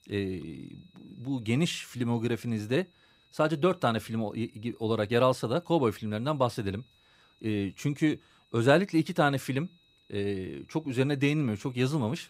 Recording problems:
high-pitched whine; faint; throughout; 4 kHz, 35 dB below the speech

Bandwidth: 15.5 kHz